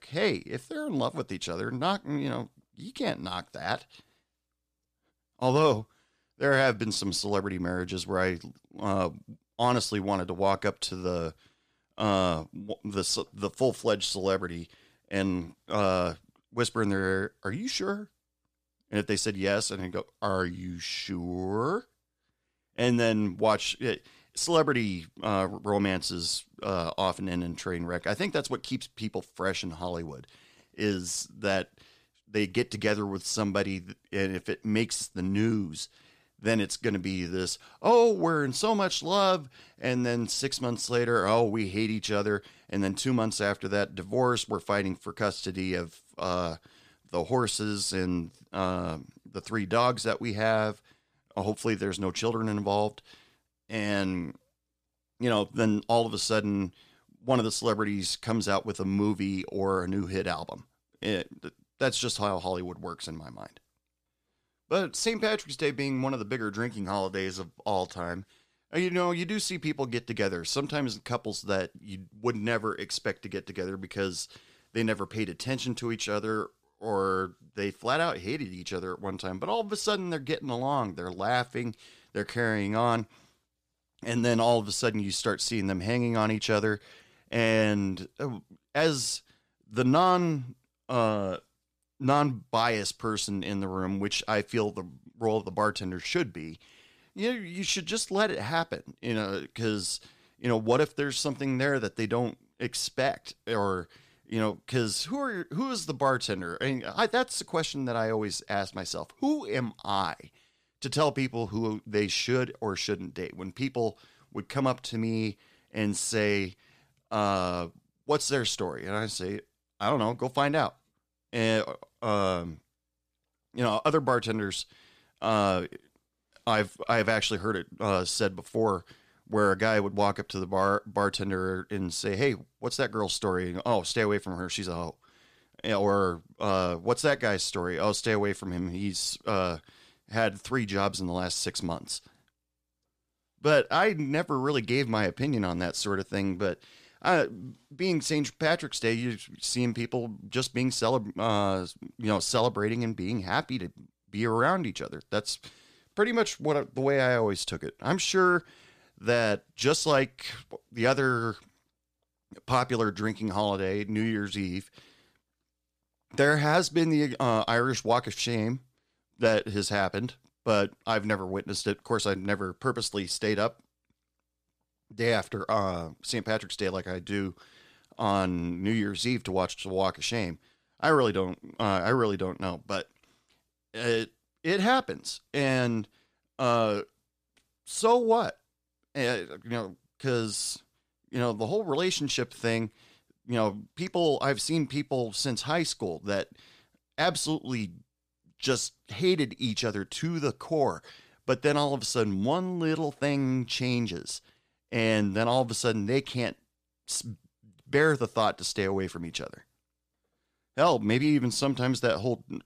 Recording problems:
none

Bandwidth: 14.5 kHz